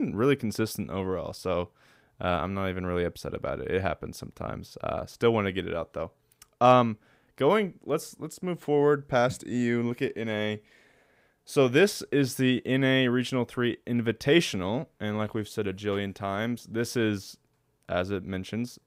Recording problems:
abrupt cut into speech; at the start

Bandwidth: 15.5 kHz